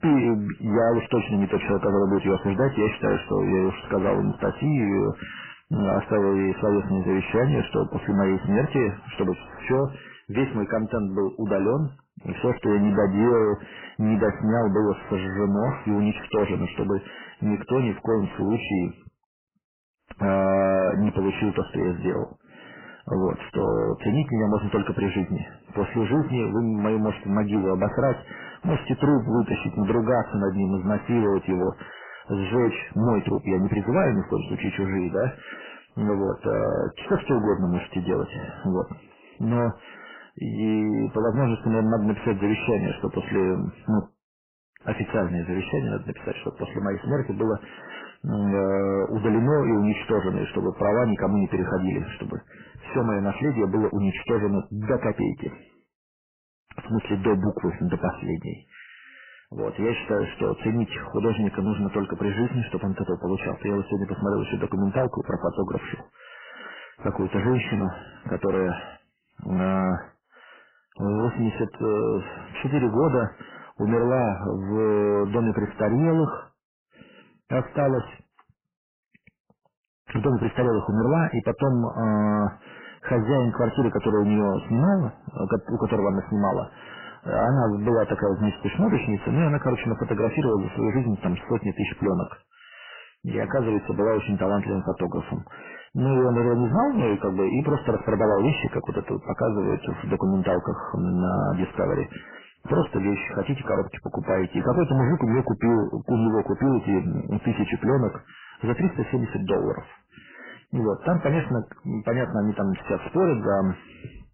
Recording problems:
distortion; heavy; 7 dB below the speech
garbled, watery; badly; nothing above 3 kHz

